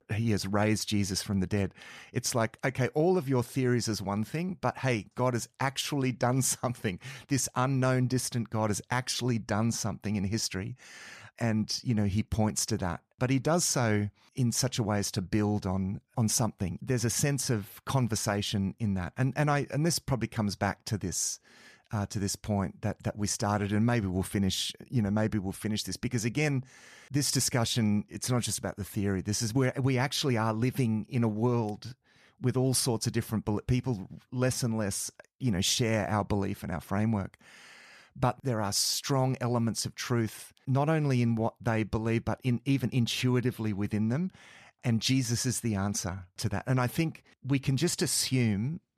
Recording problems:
none

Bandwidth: 14.5 kHz